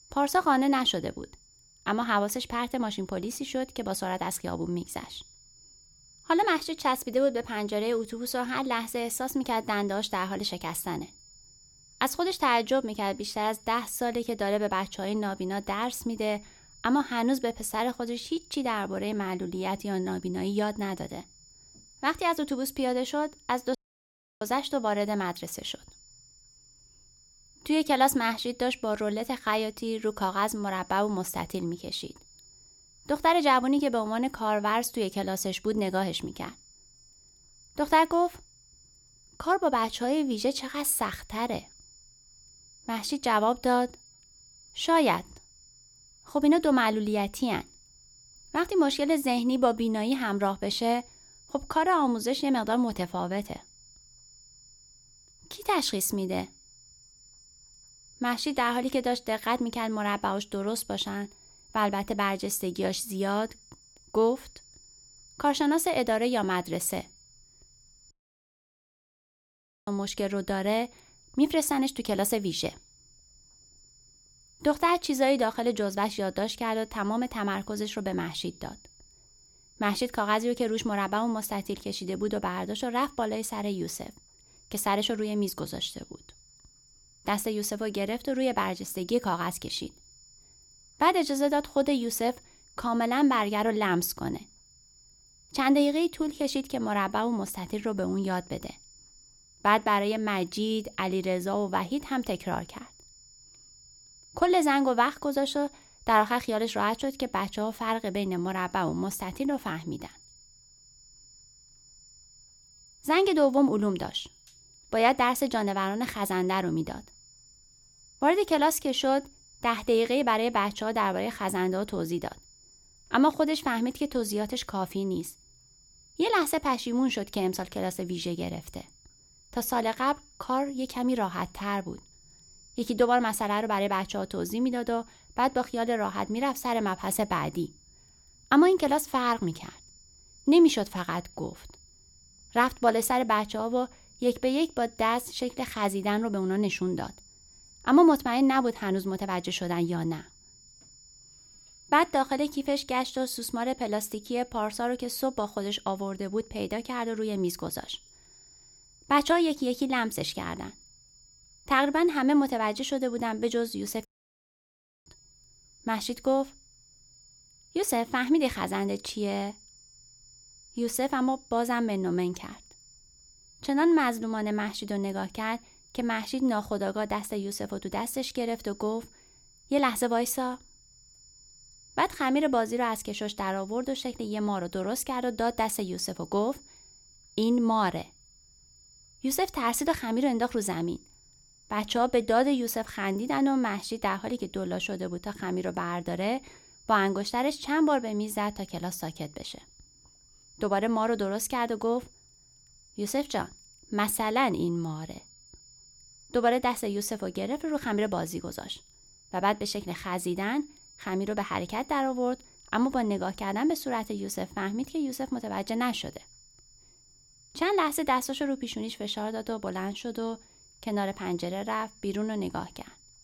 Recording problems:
high-pitched whine; faint; throughout; 7 kHz, 25 dB below the speech
audio cutting out; at 24 s for 0.5 s, at 1:08 for 2 s and at 2:44 for 1 s

